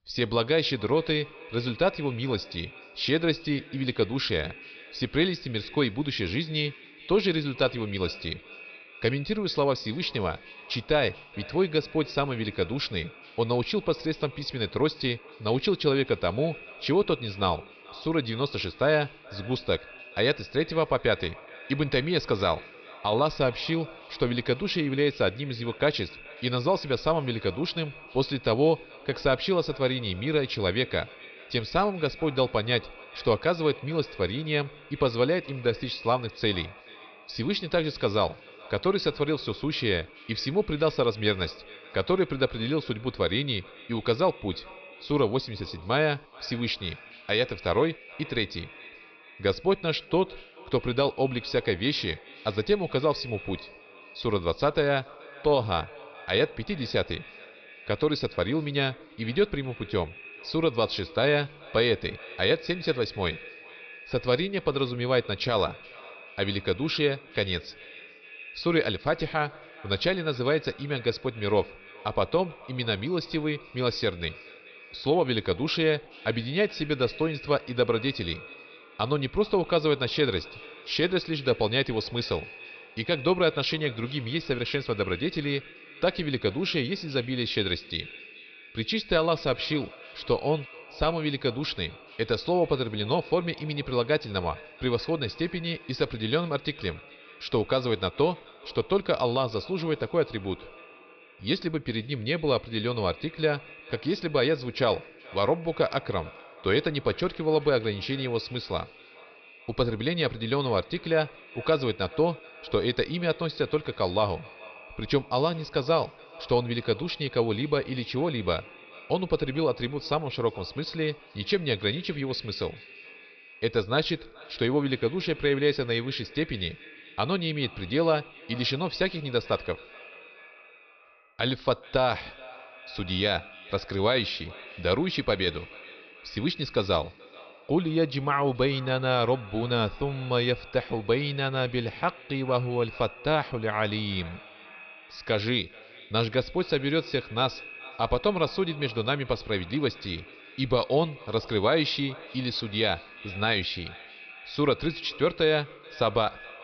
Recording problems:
echo of what is said; noticeable; throughout; 430 ms later, 20 dB below the speech
high frequencies cut off; noticeable; nothing above 5.5 kHz

